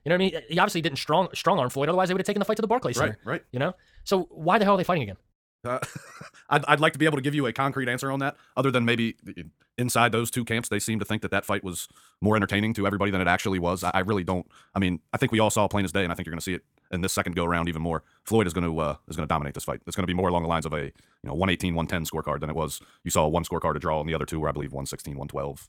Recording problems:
wrong speed, natural pitch; too fast; 1.7 times normal speed

